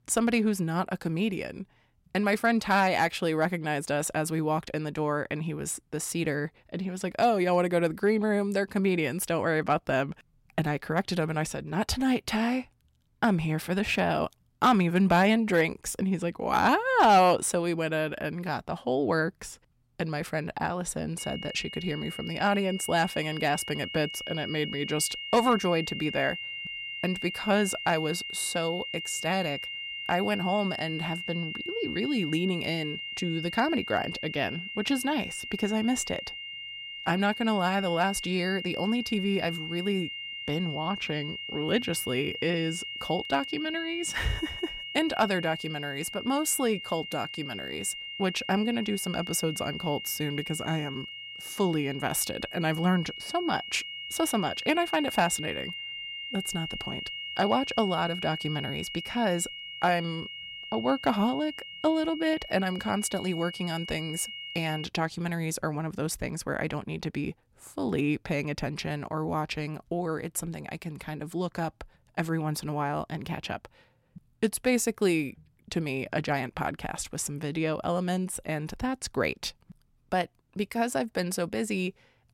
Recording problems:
high-pitched whine; loud; from 21 s to 1:05; 3 kHz, 7 dB below the speech

